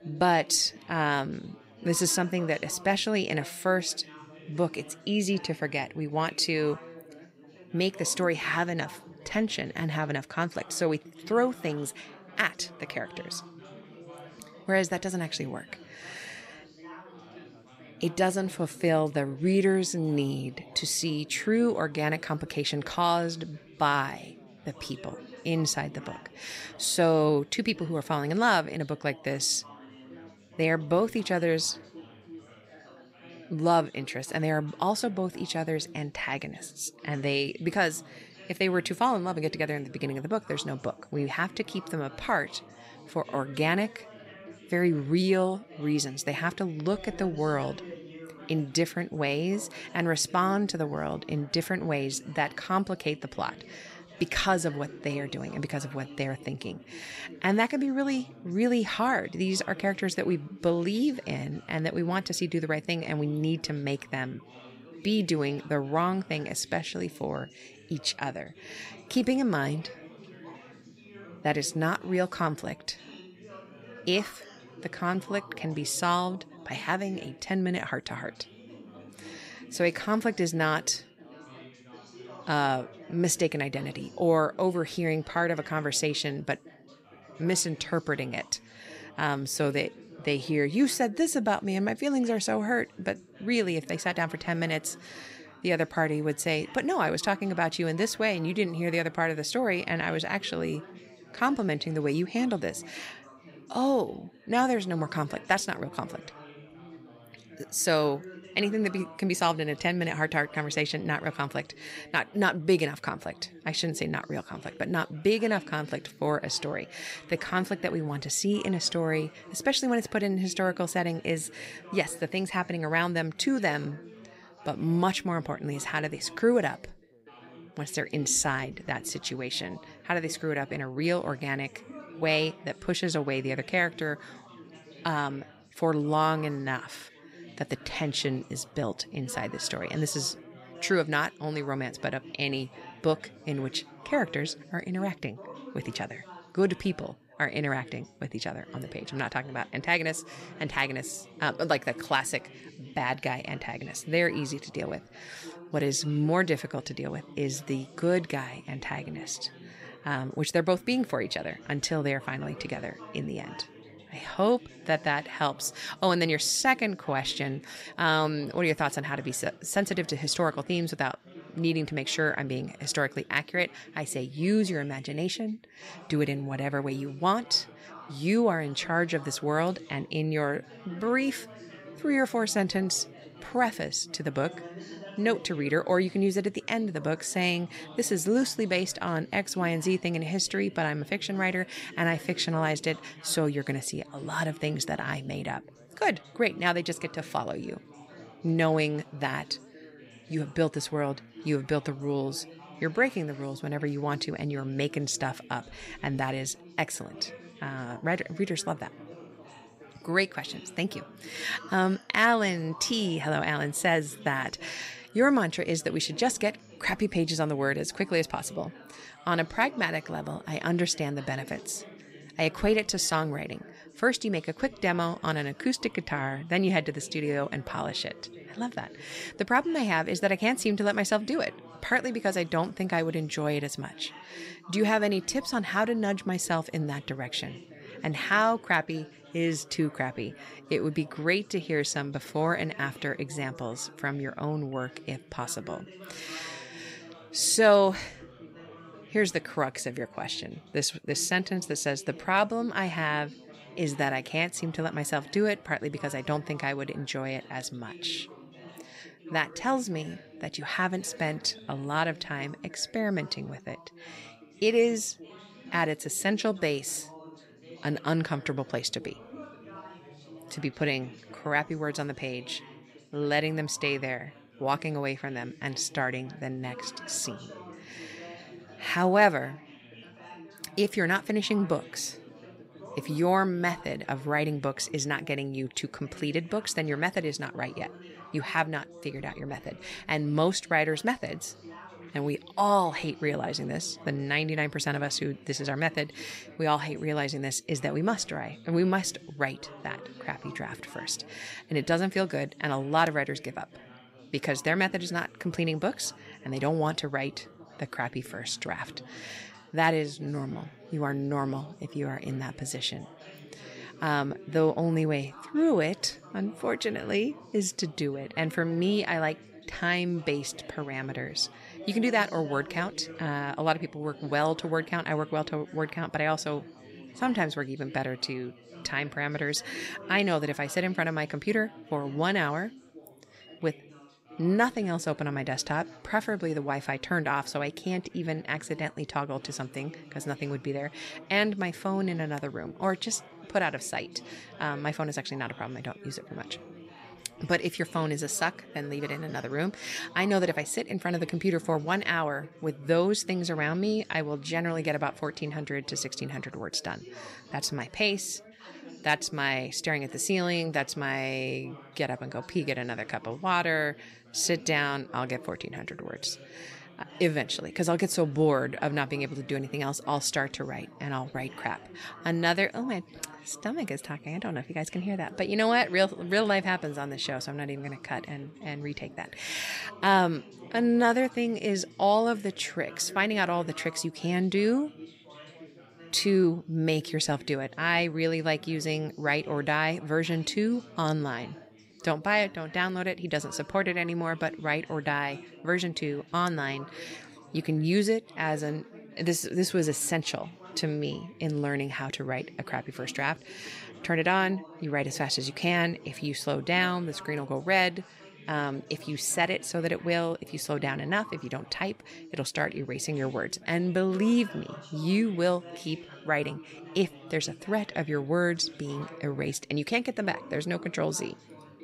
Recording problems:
background chatter; noticeable; throughout; 4 voices, 20 dB below the speech

